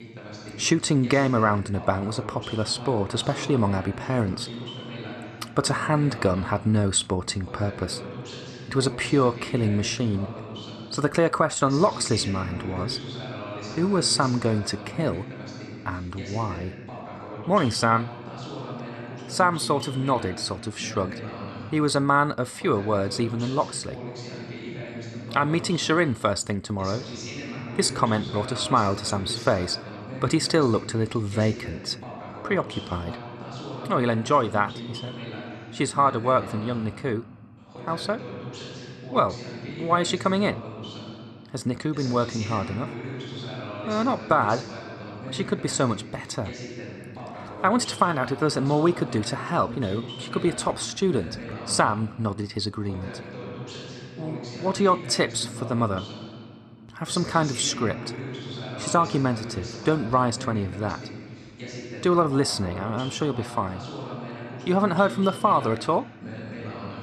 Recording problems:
voice in the background; noticeable; throughout; 10 dB below the speech

